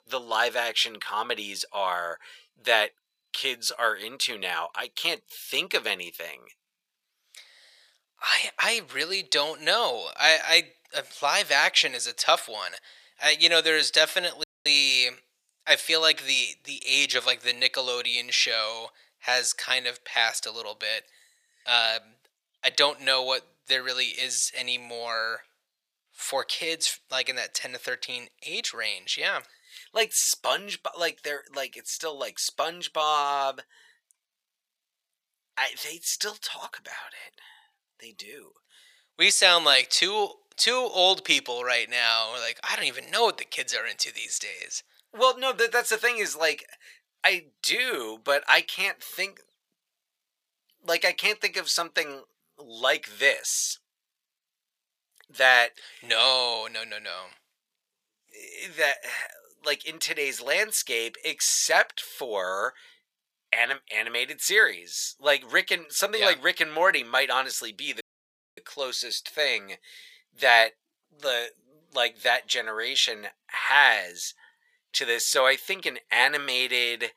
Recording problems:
thin; very; fading below 750 Hz
audio cutting out; at 14 s and at 1:08 for 0.5 s

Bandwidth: 15 kHz